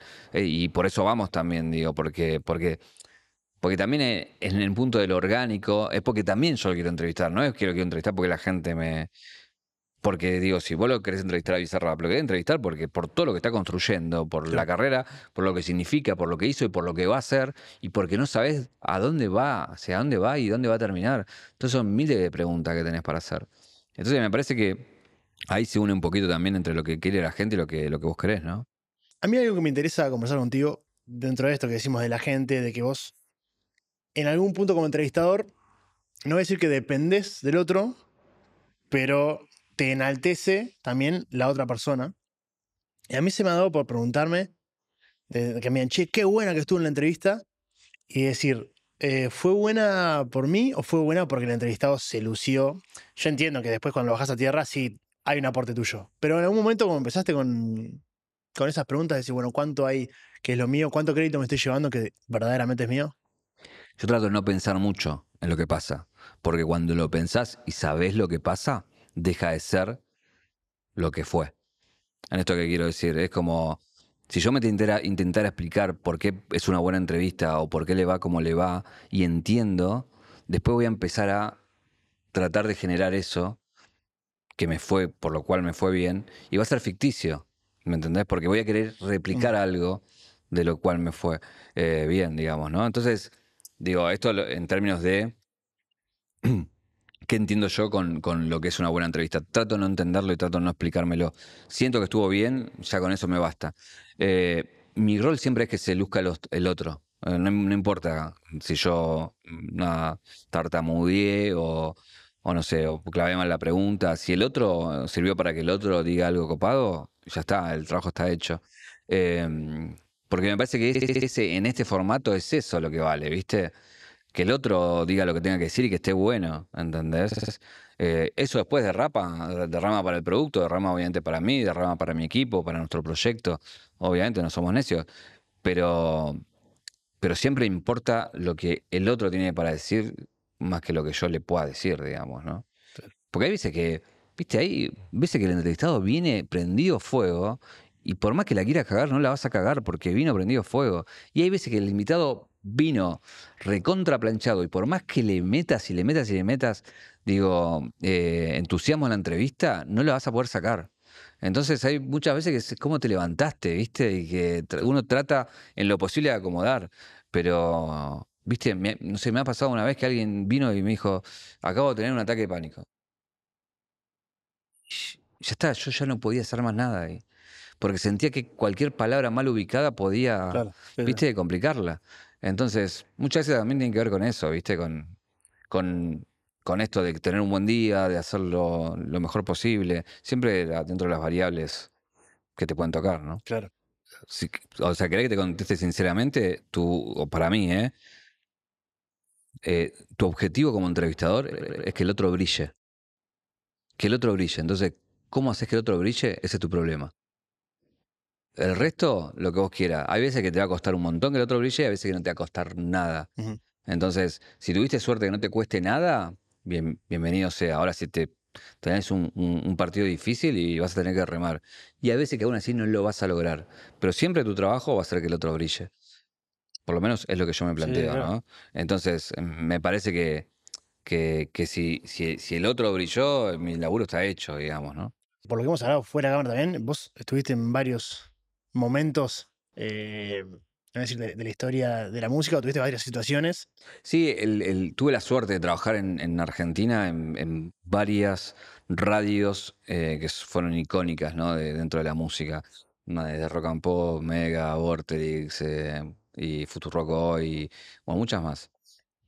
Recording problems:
audio stuttering; at 2:01, at 2:07 and at 3:21

